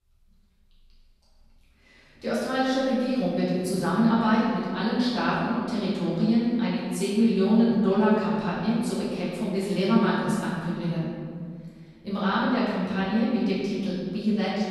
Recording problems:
room echo; strong; dies away in 1.9 s
off-mic speech; far

